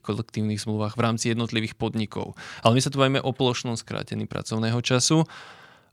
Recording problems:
none

